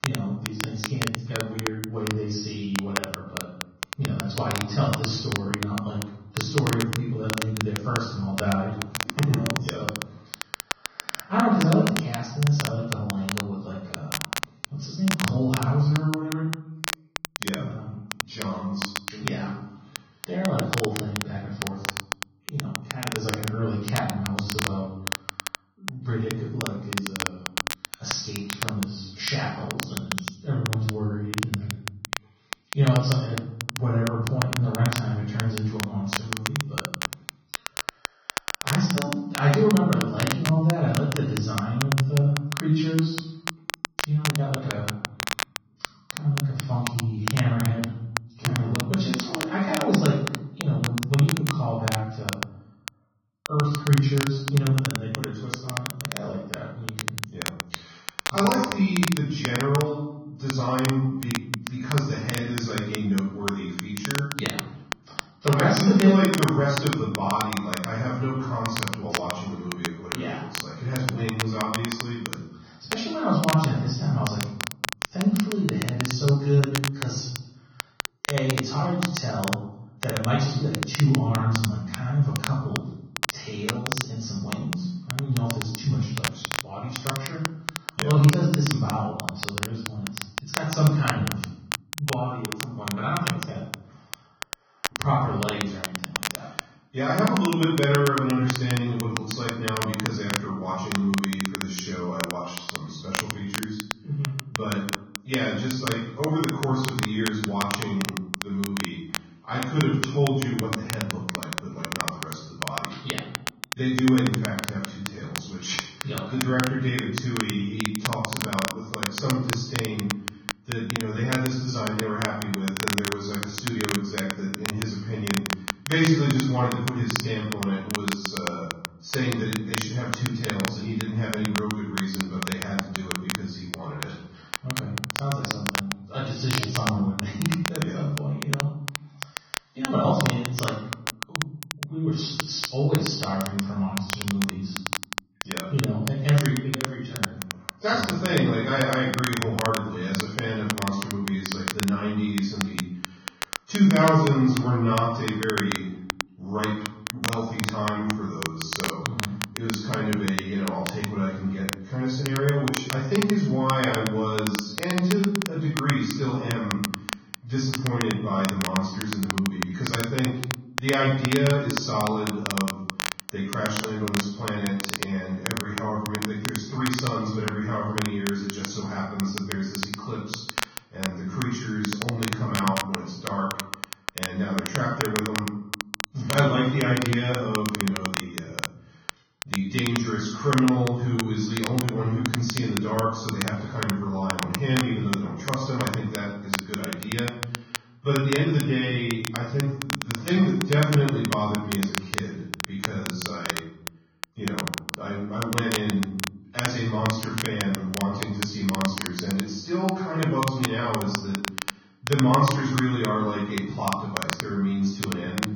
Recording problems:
off-mic speech; far
garbled, watery; badly; nothing above 6.5 kHz
room echo; noticeable; dies away in 0.8 s
crackle, like an old record; loud; 6 dB below the speech

